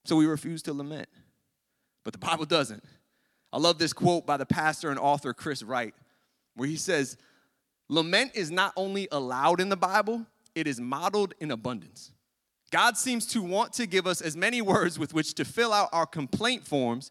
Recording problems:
none

